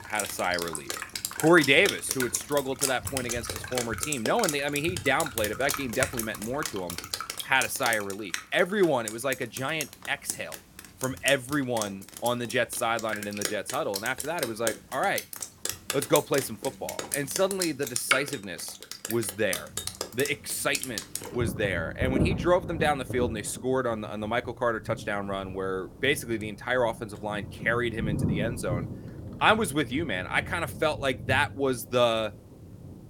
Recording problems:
rain or running water; loud; throughout; 6 dB below the speech

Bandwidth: 17 kHz